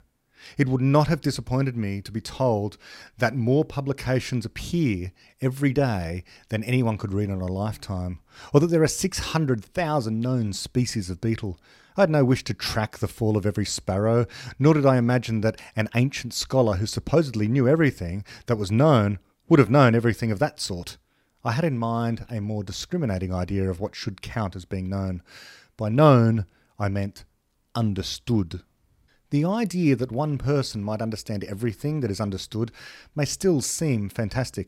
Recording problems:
none

